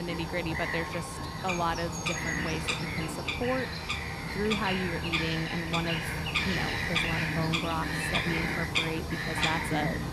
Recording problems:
animal sounds; very loud; throughout; 3 dB above the speech
abrupt cut into speech; at the start

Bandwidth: 14.5 kHz